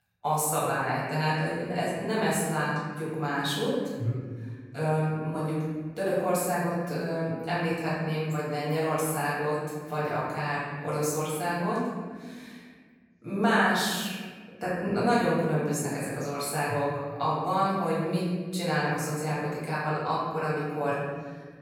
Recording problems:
room echo; strong; dies away in 1.6 s
off-mic speech; far

